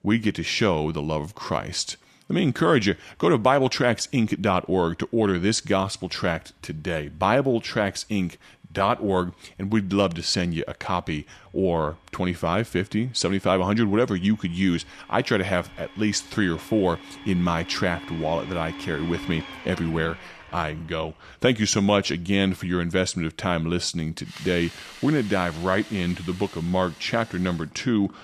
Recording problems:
household noises; noticeable; throughout; 15 dB below the speech

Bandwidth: 14 kHz